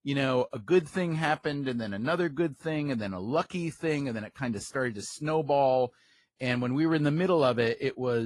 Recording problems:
garbled, watery; slightly
abrupt cut into speech; at the end

